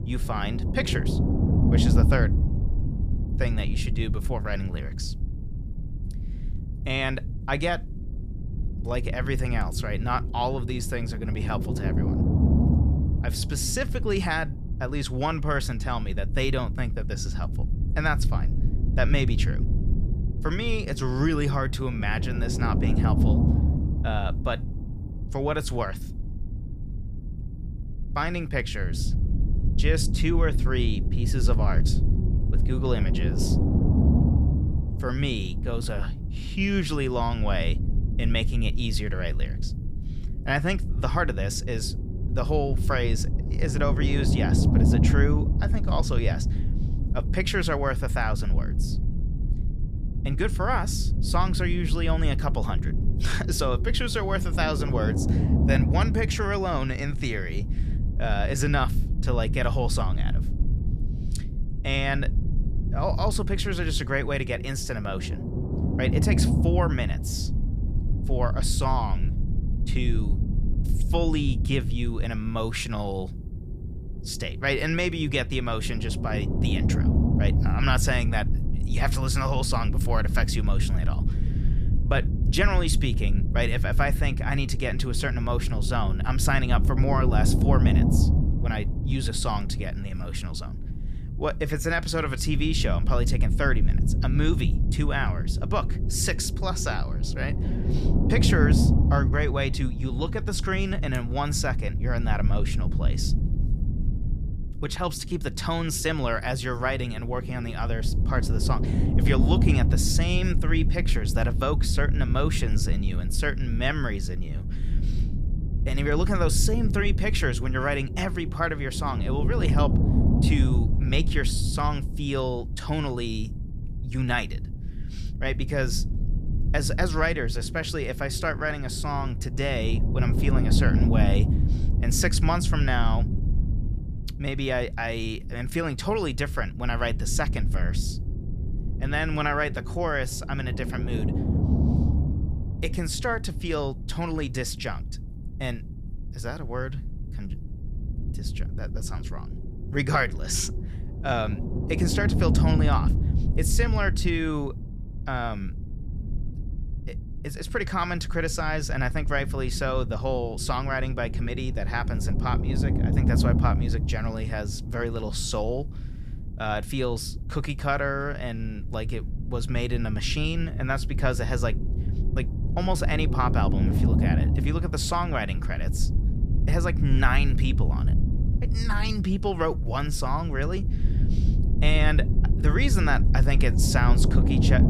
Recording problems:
low rumble; loud; throughout; 9 dB below the speech

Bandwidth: 14.5 kHz